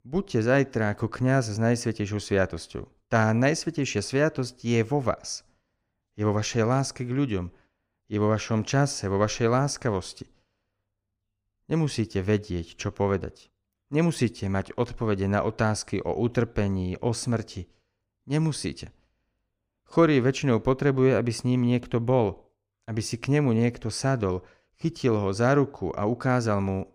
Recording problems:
none

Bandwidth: 15 kHz